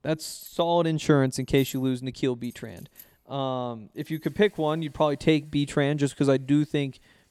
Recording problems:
household noises; faint; throughout; 25 dB below the speech

